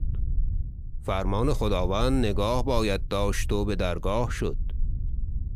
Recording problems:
low rumble; faint; throughout; 25 dB below the speech

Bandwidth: 15 kHz